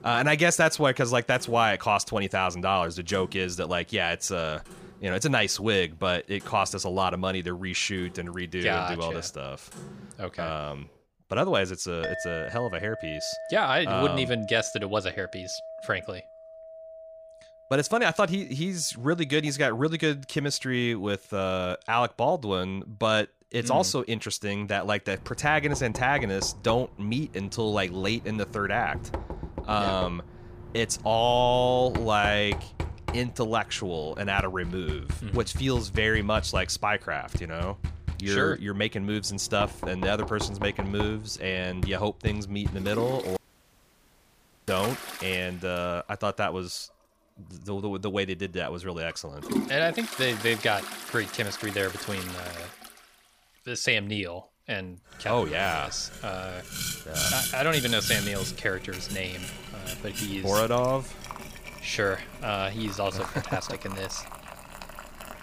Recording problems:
household noises; loud; throughout; 9 dB below the speech
audio cutting out; at 43 s for 1.5 s

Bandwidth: 15 kHz